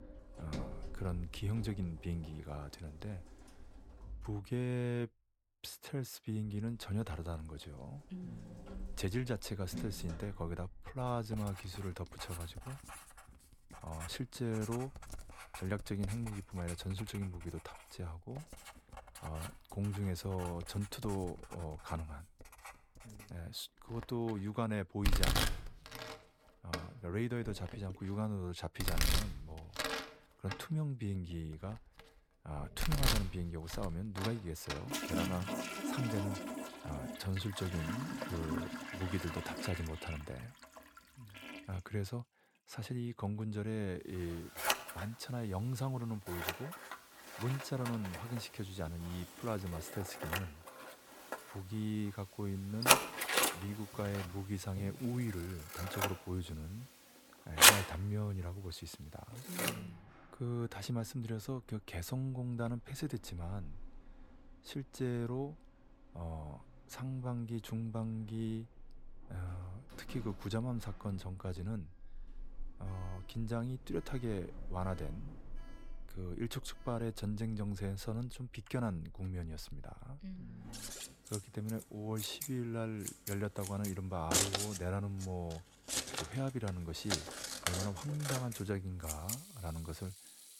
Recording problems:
household noises; very loud; throughout; 4 dB above the speech

